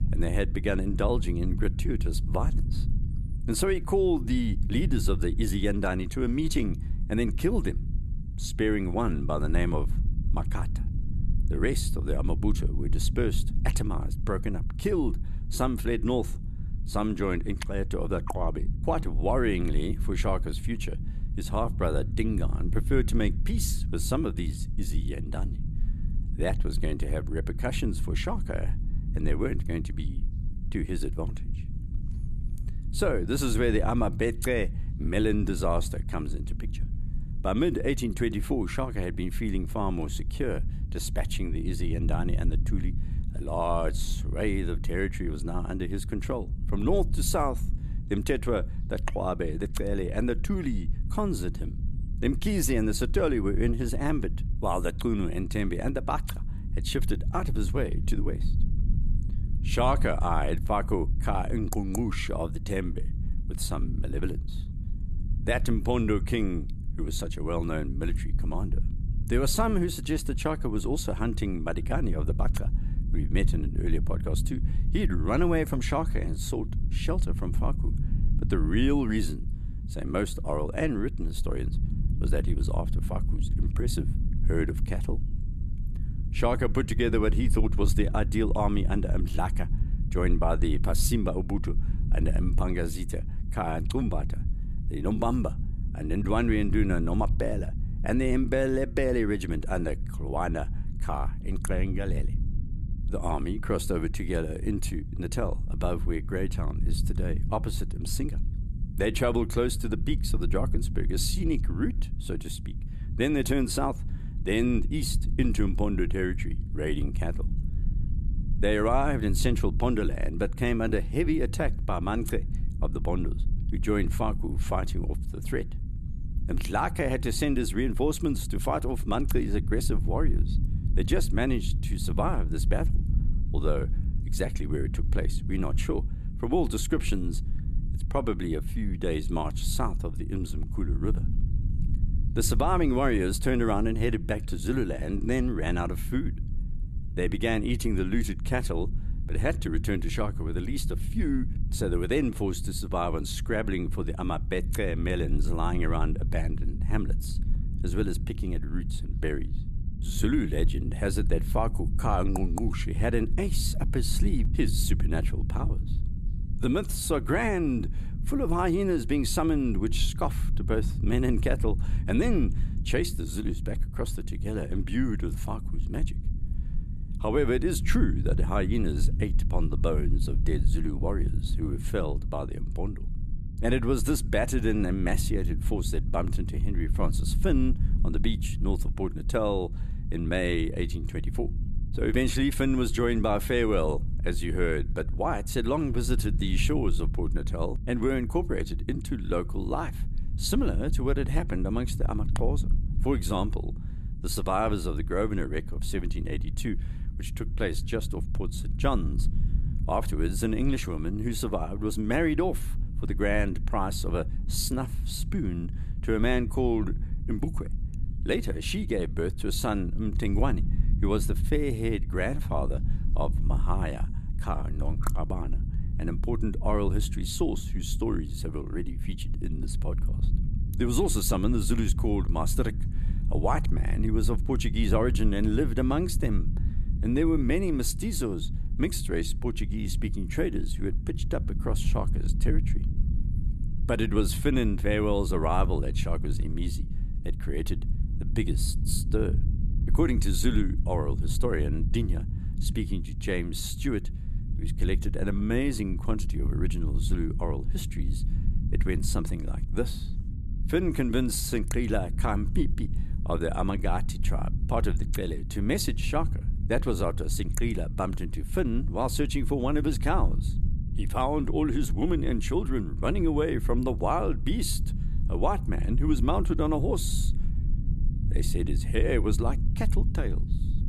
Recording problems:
low rumble; noticeable; throughout; 15 dB below the speech

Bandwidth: 13.5 kHz